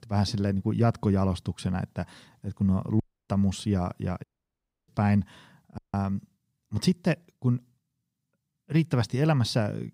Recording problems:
audio cutting out; at 3 s, at 4 s for 0.5 s and at 6 s

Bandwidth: 15.5 kHz